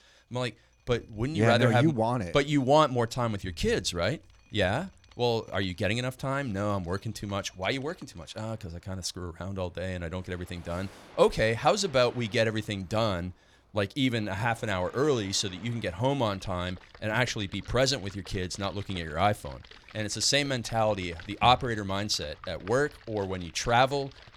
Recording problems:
rain or running water; faint; throughout; 25 dB below the speech

